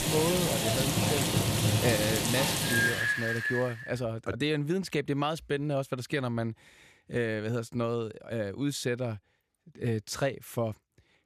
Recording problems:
rain or running water; very loud; until 3.5 s; 4 dB above the speech

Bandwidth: 14.5 kHz